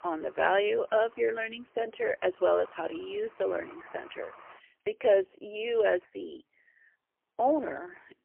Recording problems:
phone-call audio; poor line; nothing above 3 kHz
traffic noise; faint; throughout; 25 dB below the speech

